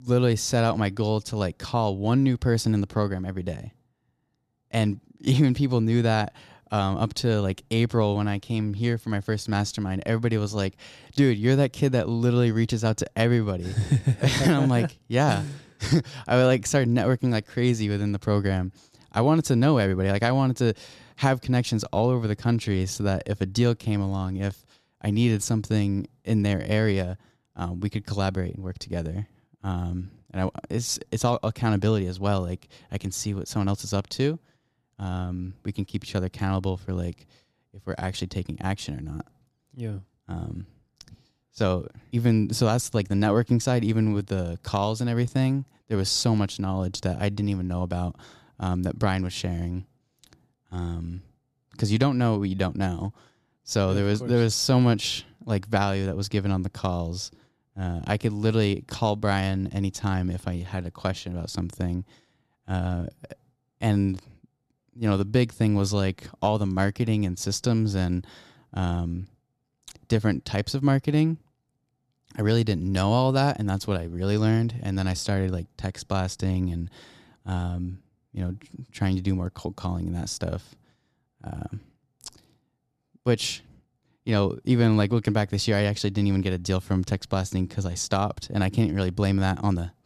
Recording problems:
none

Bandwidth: 14.5 kHz